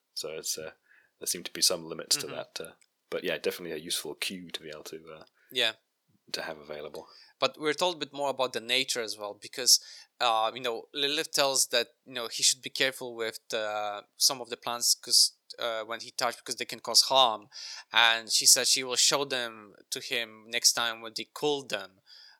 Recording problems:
thin; somewhat; fading below 450 Hz

